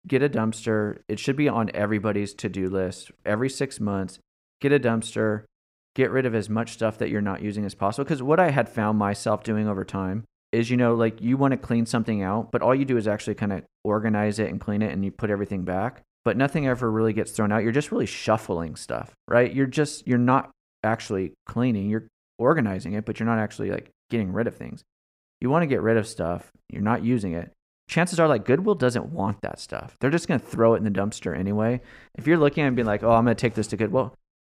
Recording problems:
none

